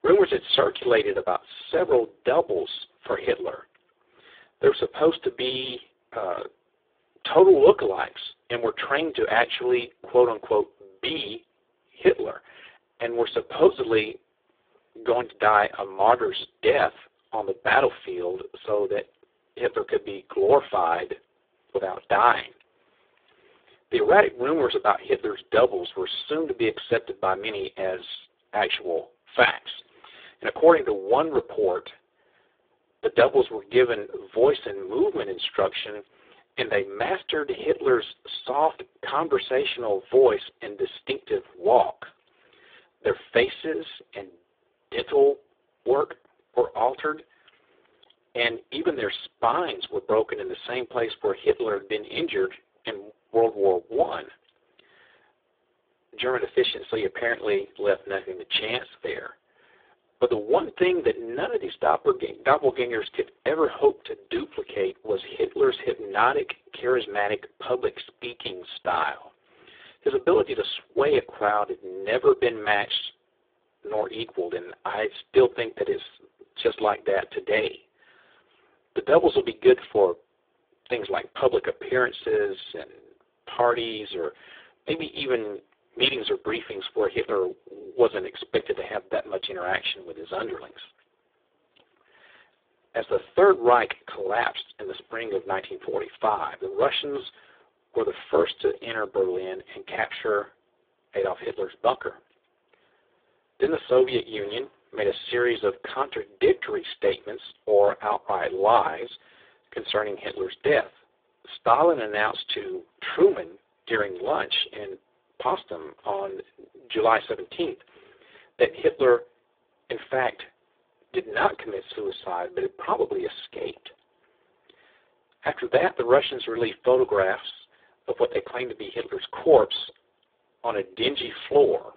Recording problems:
phone-call audio; poor line

